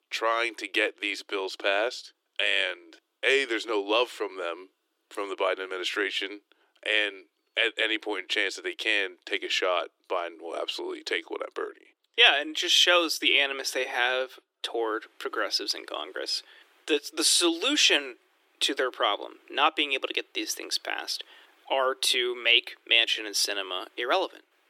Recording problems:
thin; very; fading below 300 Hz

